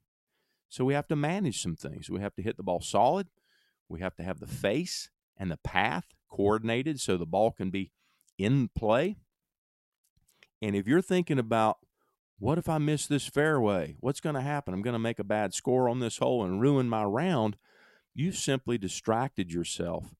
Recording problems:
none

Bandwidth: 16 kHz